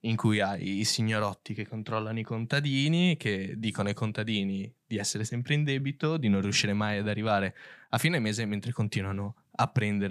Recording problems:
abrupt cut into speech; at the end

